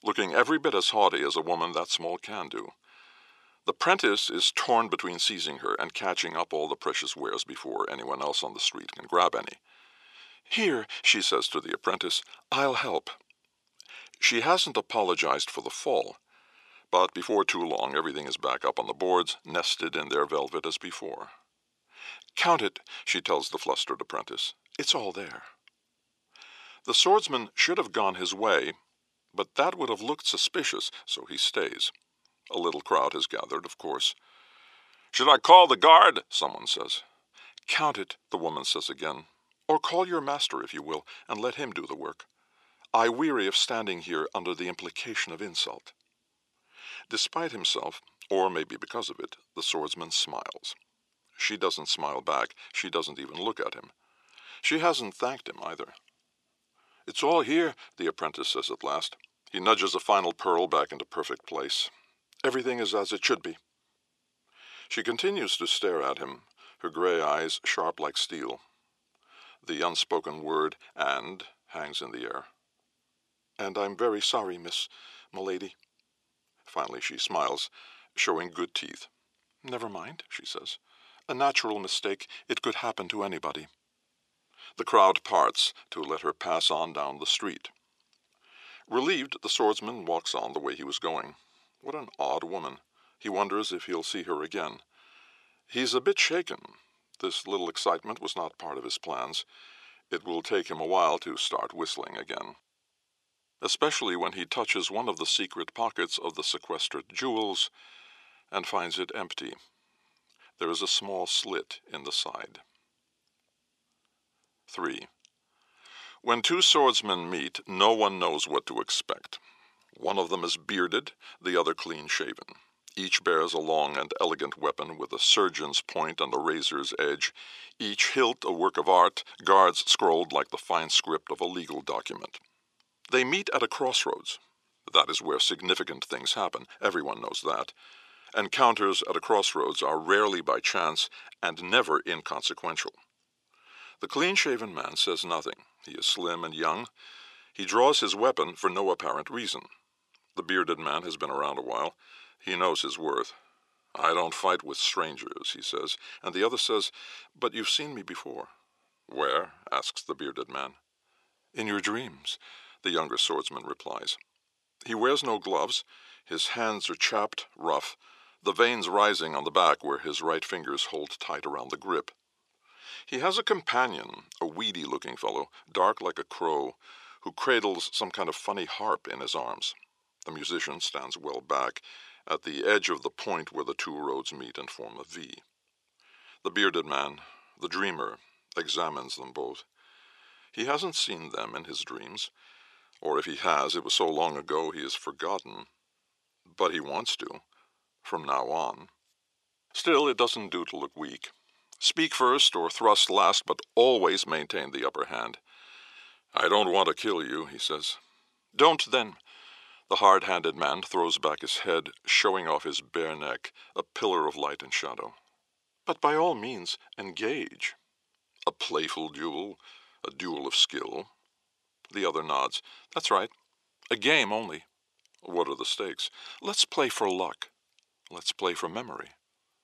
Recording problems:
thin; very; fading below 550 Hz

